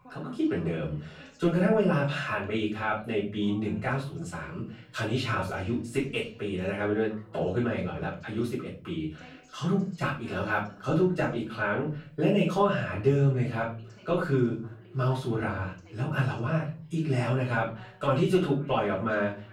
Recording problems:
off-mic speech; far
room echo; slight; dies away in 0.4 s
voice in the background; faint; throughout; 25 dB below the speech

